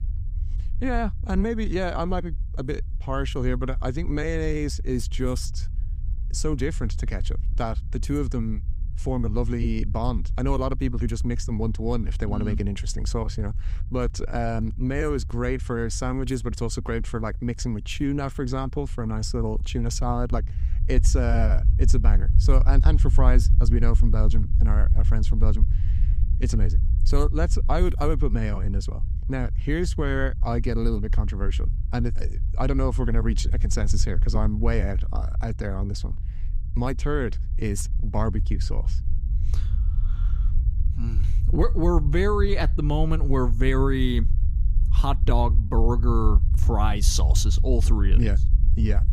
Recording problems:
low rumble; noticeable; throughout; 15 dB below the speech

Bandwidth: 15.5 kHz